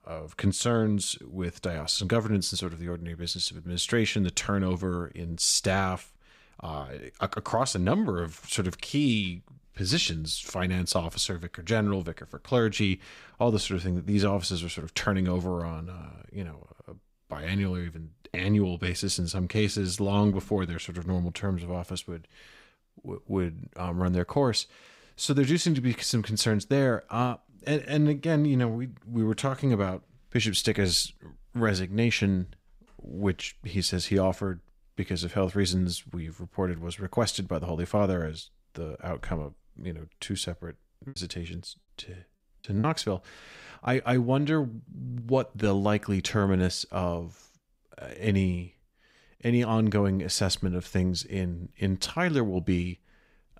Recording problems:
choppy; very; from 41 to 43 s; 7% of the speech affected

